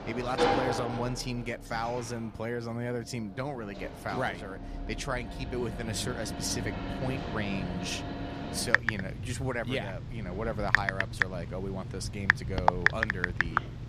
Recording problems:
household noises; very loud; throughout; 3 dB above the speech

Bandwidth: 14.5 kHz